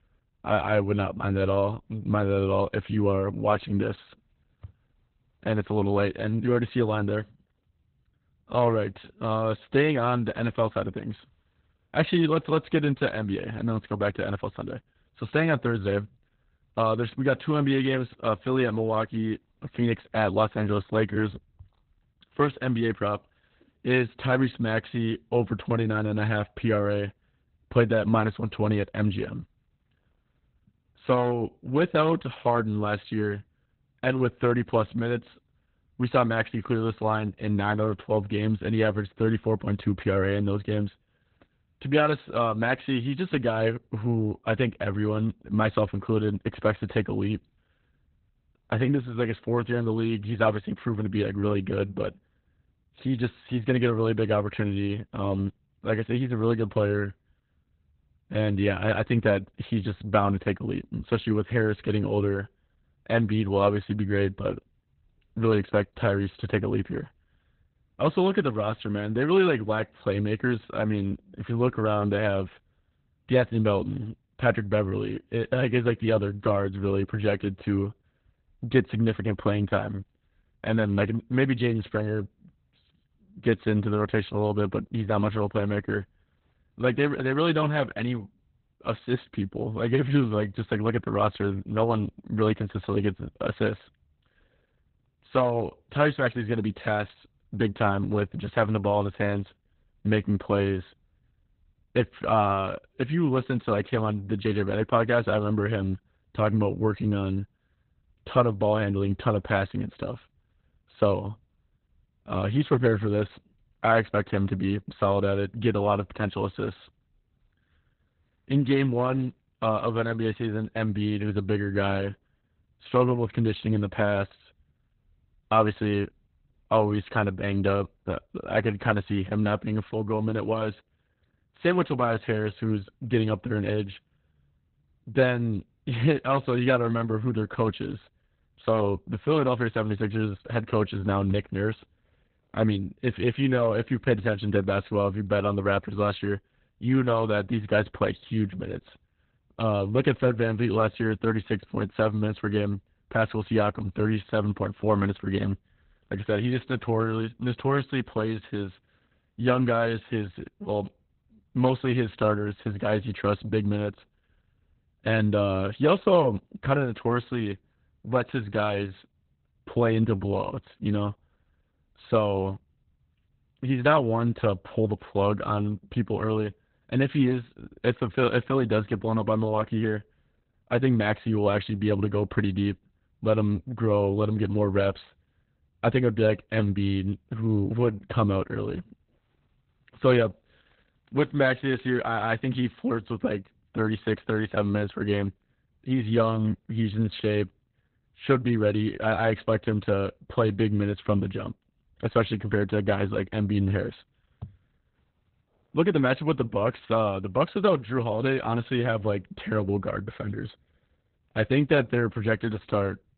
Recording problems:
garbled, watery; badly; nothing above 4 kHz

